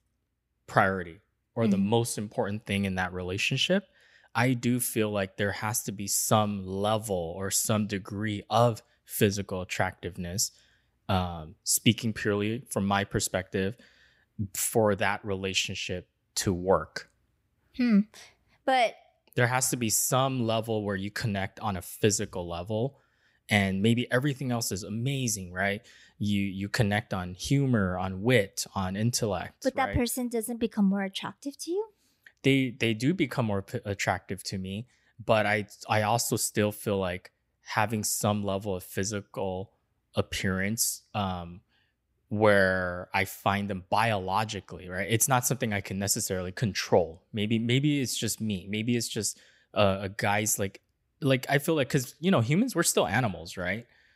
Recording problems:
none

